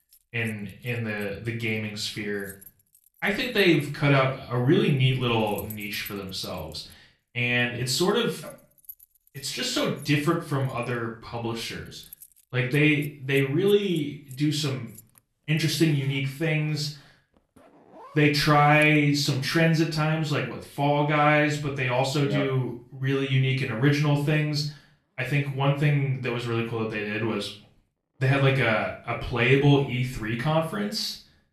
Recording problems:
off-mic speech; far
room echo; slight; dies away in 0.3 s
household noises; faint; throughout; 25 dB below the speech

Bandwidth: 13.5 kHz